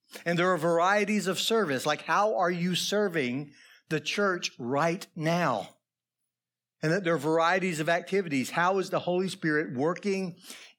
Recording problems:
none

